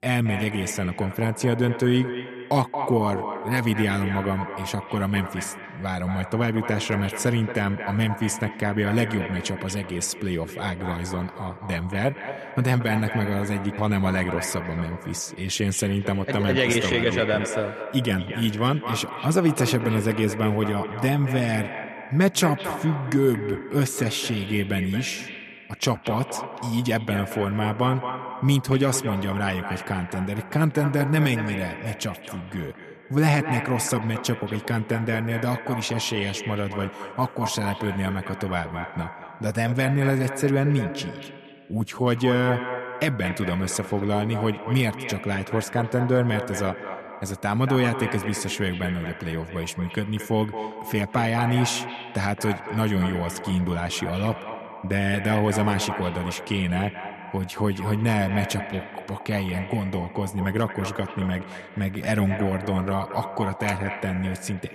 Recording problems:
echo of what is said; strong; throughout; 230 ms later, 9 dB below the speech

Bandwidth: 13.5 kHz